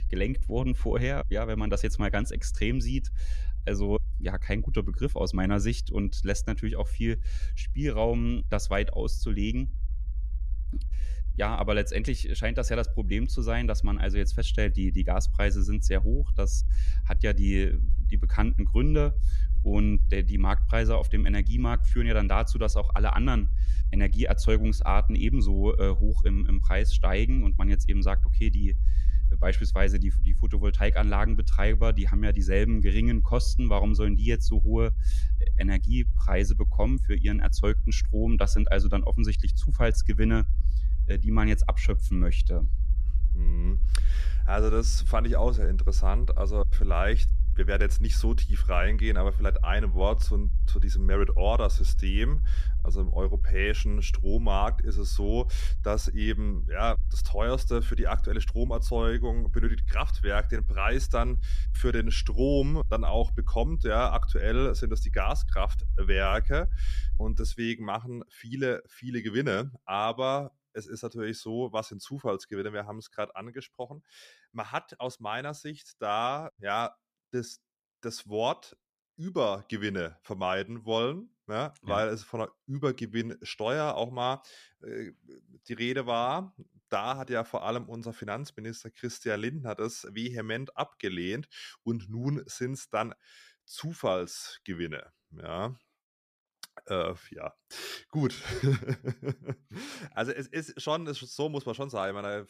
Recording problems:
low rumble; noticeable; until 1:08; 20 dB below the speech

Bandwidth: 14.5 kHz